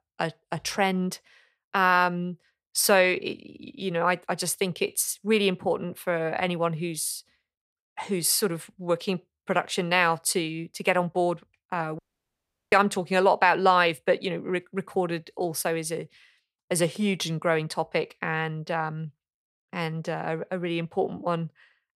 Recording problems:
audio cutting out; at 12 s for 0.5 s

